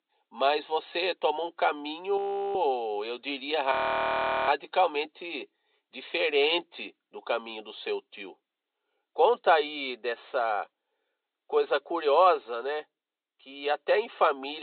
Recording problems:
high frequencies cut off; severe; nothing above 4 kHz
thin; somewhat; fading below 300 Hz
audio freezing; at 2 s and at 3.5 s for 0.5 s
abrupt cut into speech; at the end

